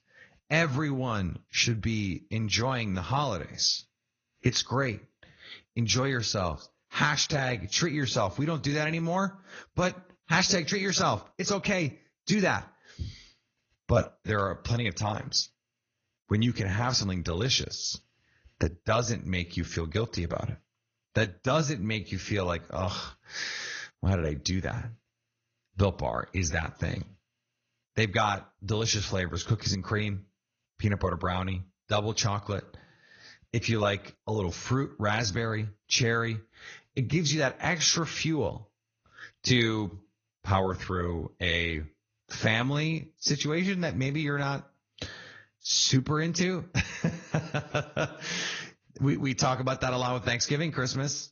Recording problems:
garbled, watery; slightly; nothing above 6.5 kHz

